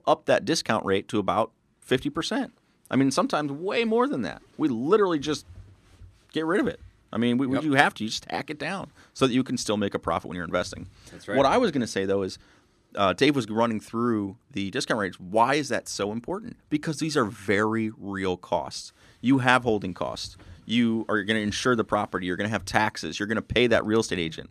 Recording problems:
none

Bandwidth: 14 kHz